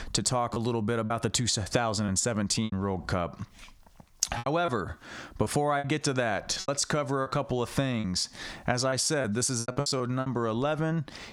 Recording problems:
squashed, flat; somewhat
choppy; very; from 0.5 to 2.5 s, from 4.5 to 6 s and from 6.5 to 10 s; 12% of the speech affected

